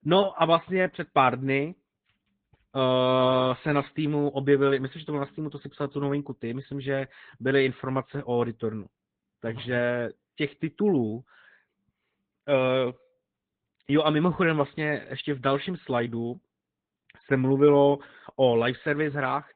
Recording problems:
high frequencies cut off; severe; nothing above 3.5 kHz
garbled, watery; slightly

